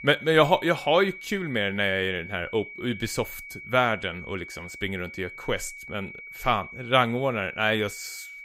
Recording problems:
high-pitched whine; noticeable; throughout; 2.5 kHz, 15 dB below the speech

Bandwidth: 15.5 kHz